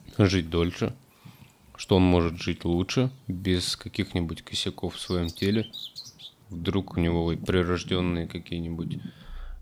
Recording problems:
animal sounds; noticeable; throughout; 15 dB below the speech

